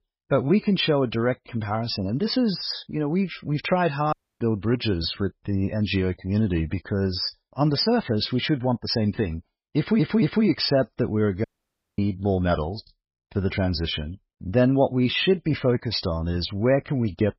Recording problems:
garbled, watery; badly; nothing above 5.5 kHz
audio cutting out; at 4 s and at 11 s for 0.5 s
audio stuttering; at 10 s

